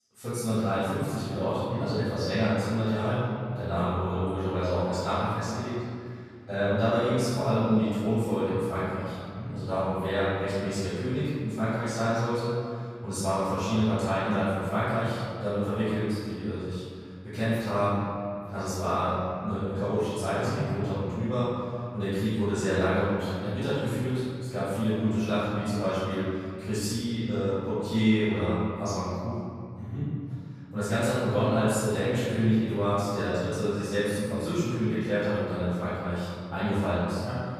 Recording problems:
room echo; strong; dies away in 2.2 s
off-mic speech; far

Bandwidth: 14.5 kHz